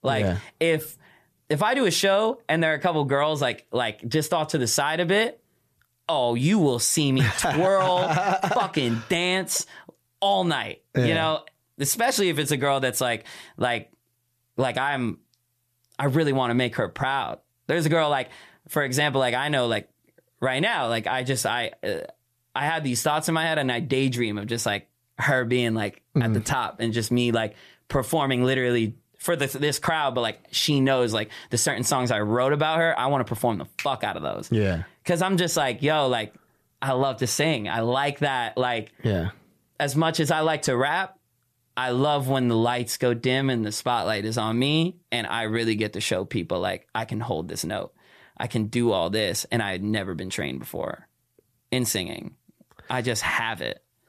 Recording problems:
none

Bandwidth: 14.5 kHz